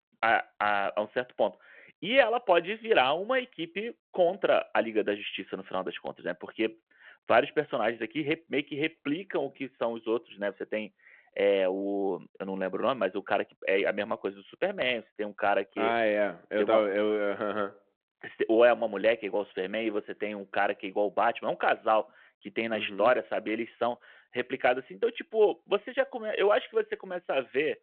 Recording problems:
phone-call audio

